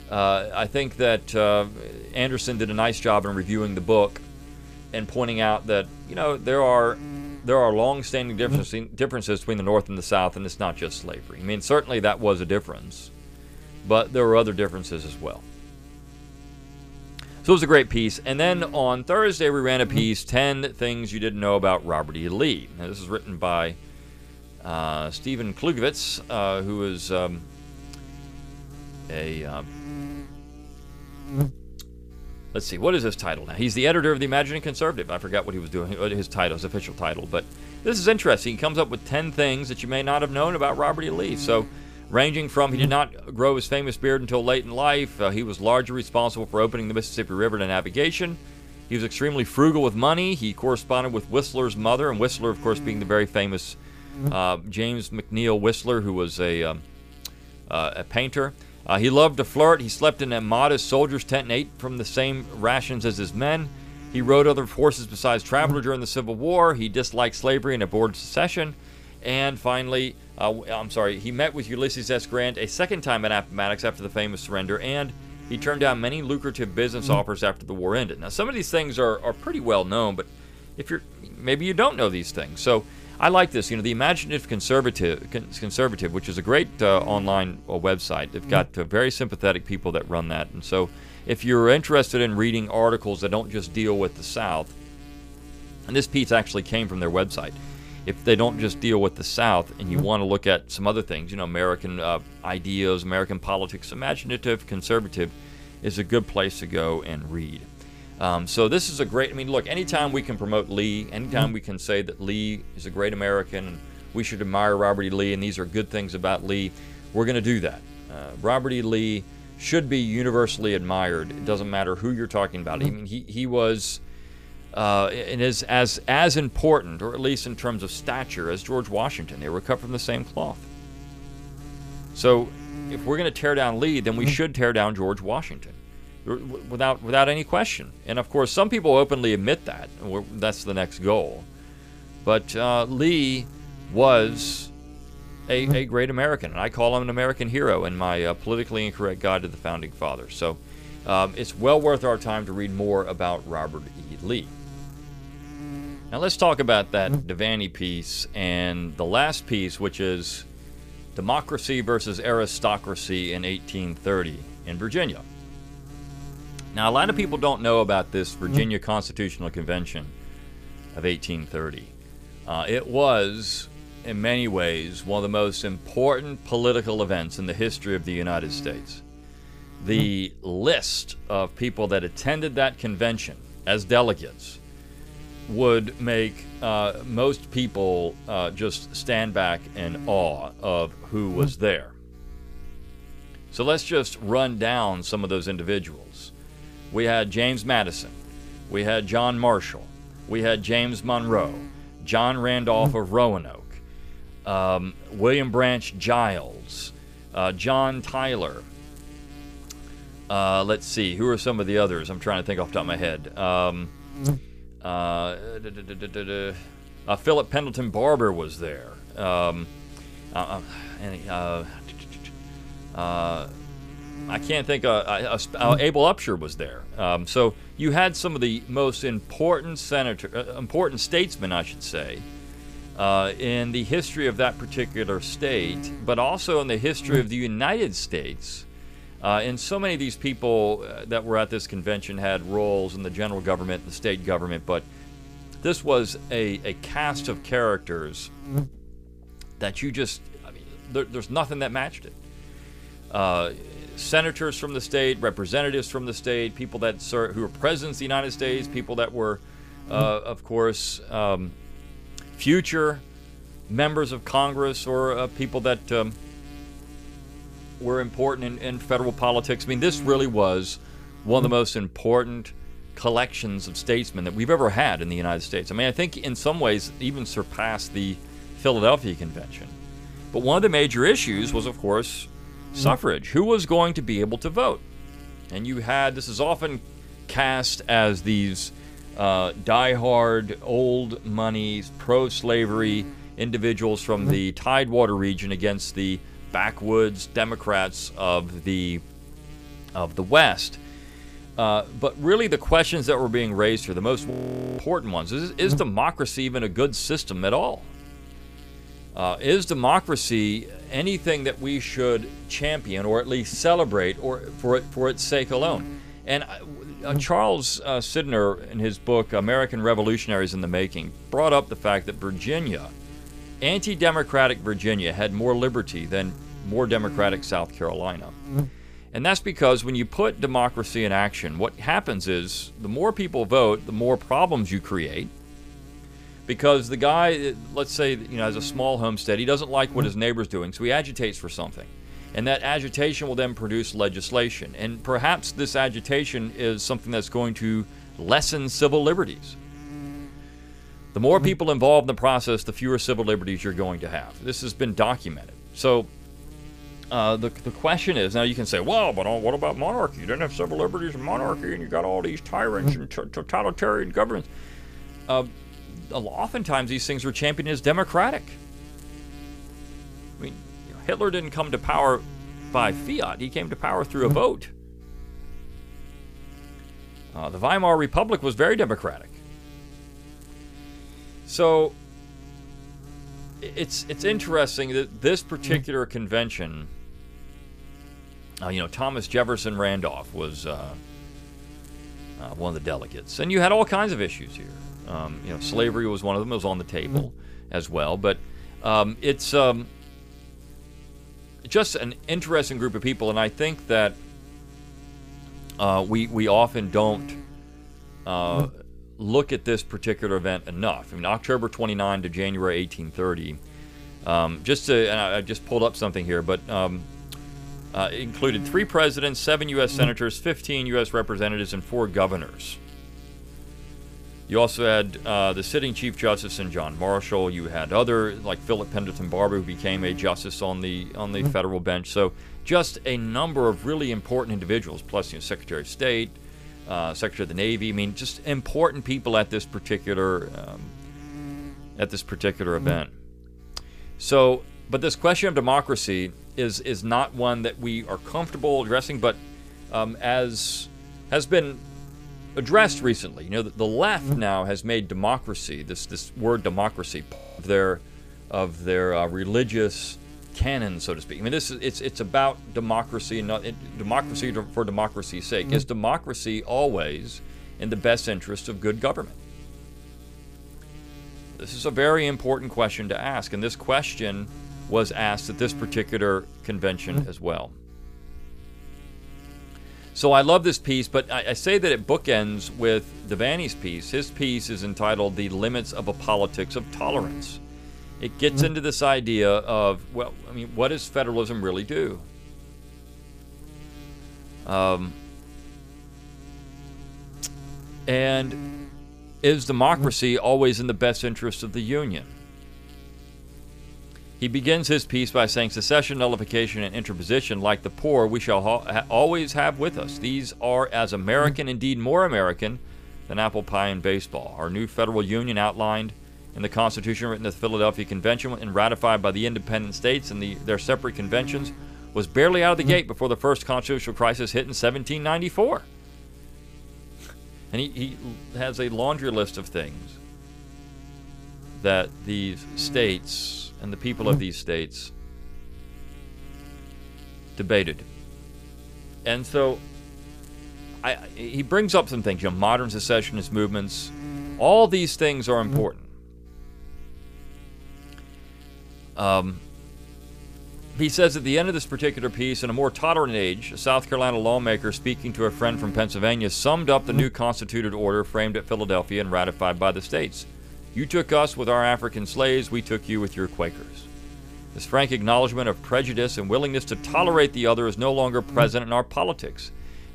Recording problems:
electrical hum; faint; throughout; 60 Hz, 20 dB below the speech
audio freezing; at 5:04 and at 7:37

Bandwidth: 15 kHz